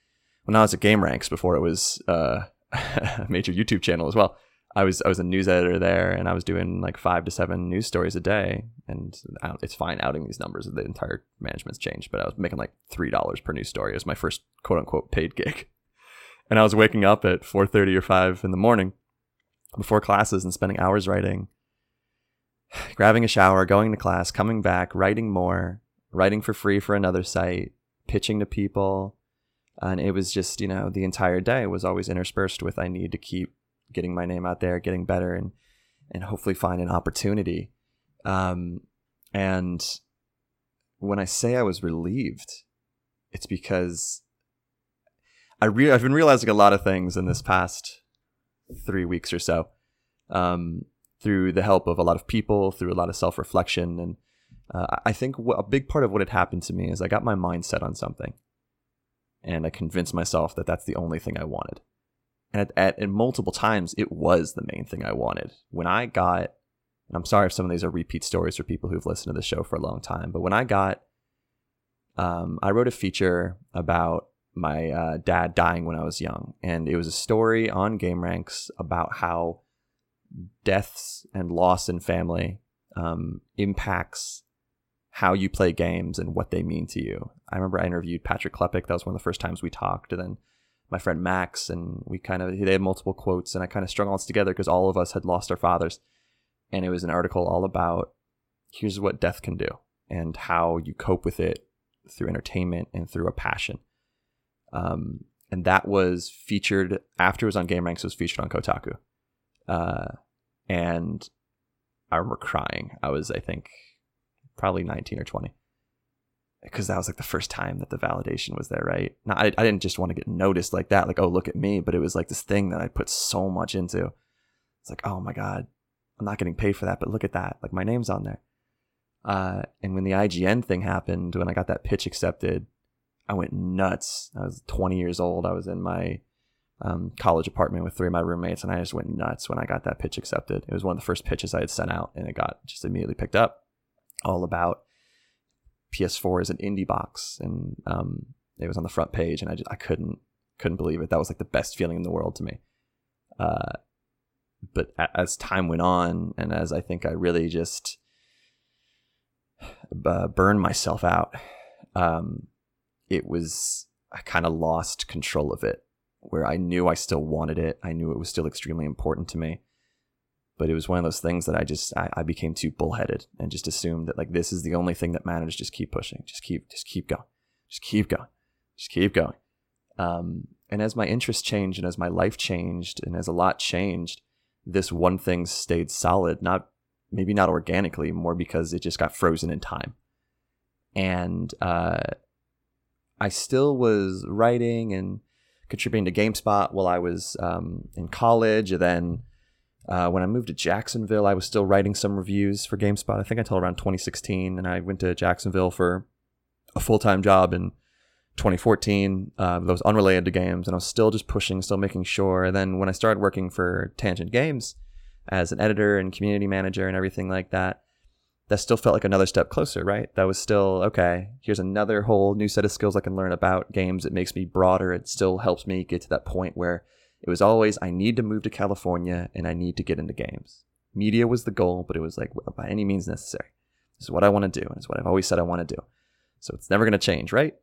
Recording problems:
none

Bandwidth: 16.5 kHz